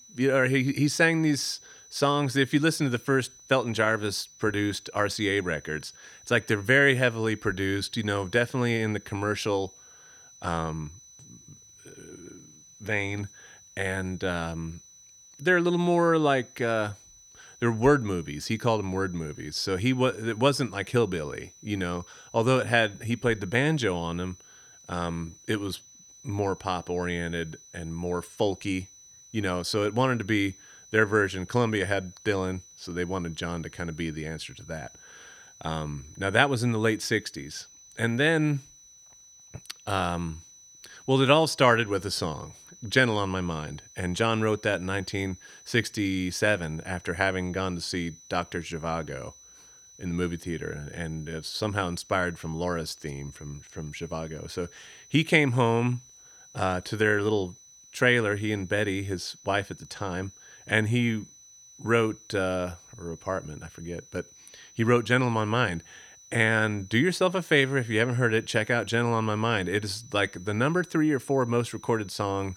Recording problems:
high-pitched whine; faint; throughout; 6 kHz, 25 dB below the speech

